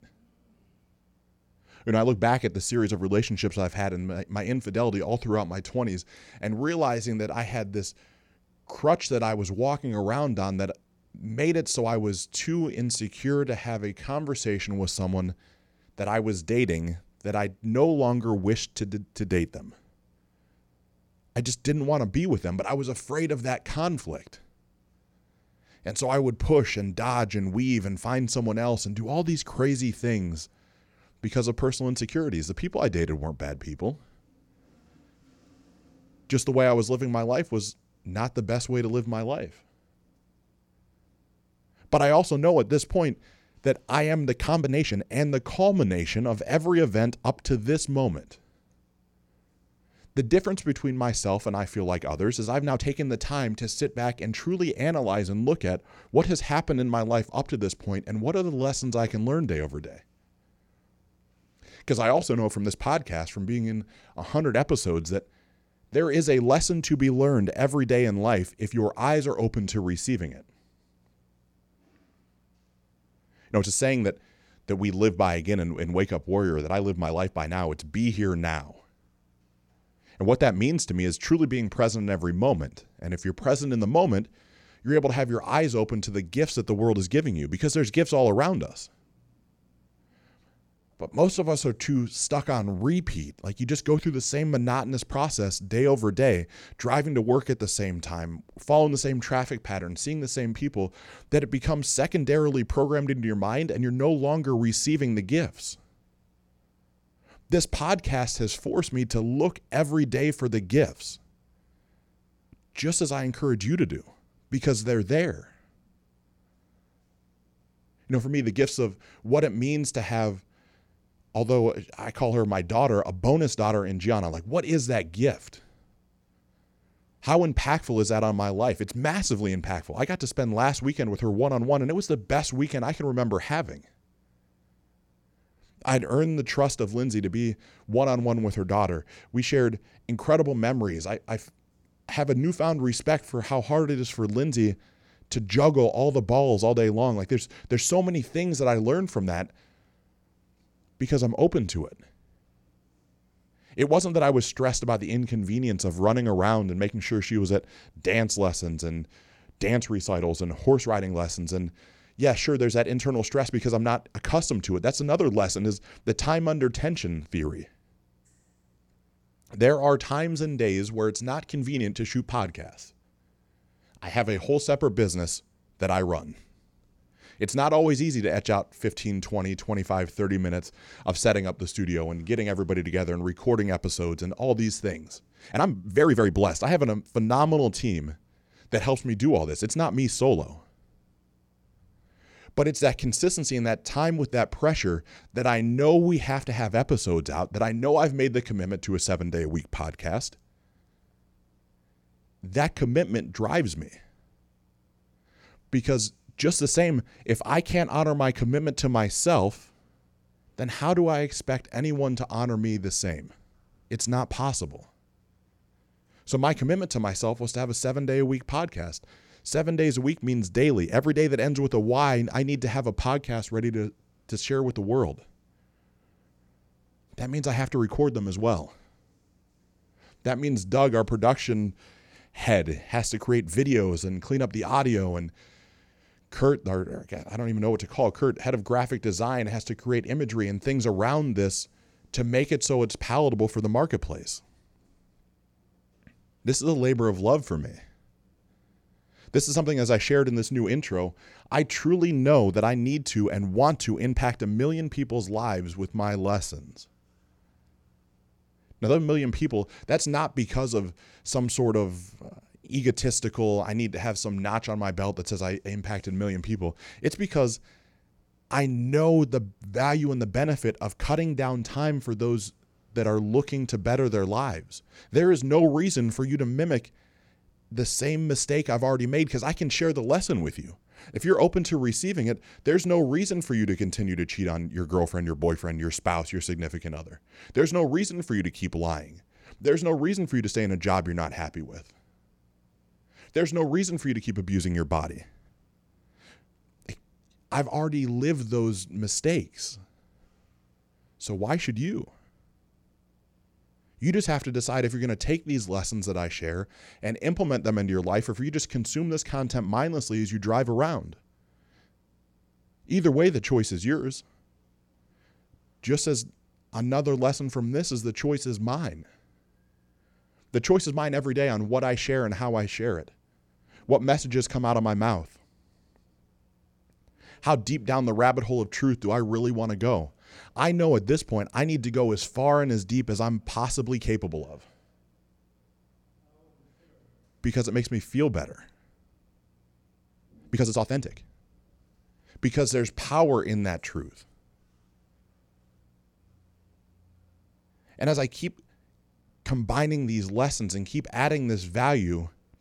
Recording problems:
uneven, jittery; strongly; from 13 s to 5:50

